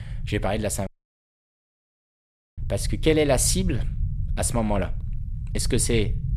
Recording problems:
low rumble; faint; throughout; 20 dB below the speech
audio cutting out; at 1 s for 1.5 s

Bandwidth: 15.5 kHz